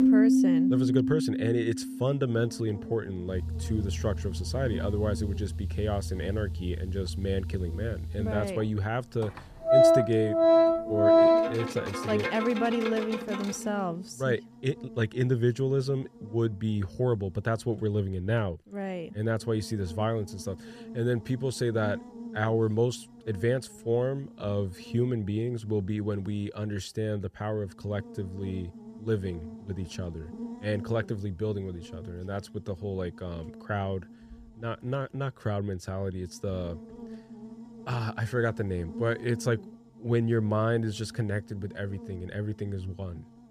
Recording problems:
background music; very loud; until 14 s; 4 dB above the speech
electrical hum; noticeable; throughout; 60 Hz, 15 dB below the speech

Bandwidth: 14.5 kHz